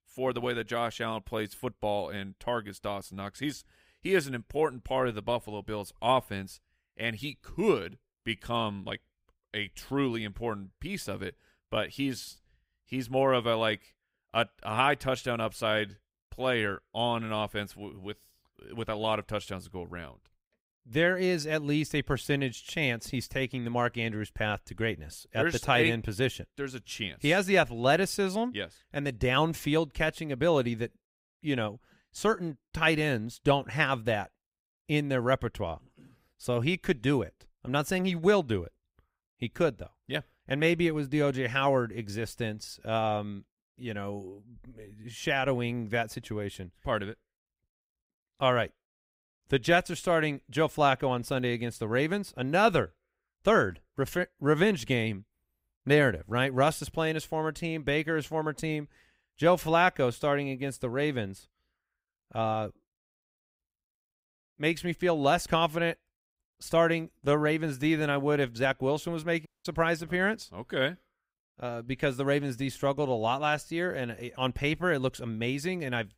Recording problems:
audio cutting out; at 1:09

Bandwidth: 15.5 kHz